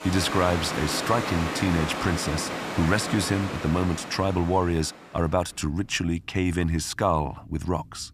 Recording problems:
rain or running water; loud; throughout; 5 dB below the speech

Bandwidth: 14.5 kHz